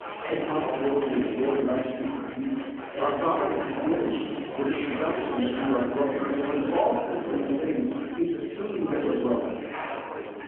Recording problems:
off-mic speech; far
room echo; noticeable; dies away in 1 s
phone-call audio
chatter from many people; loud; throughout; 4 dB below the speech

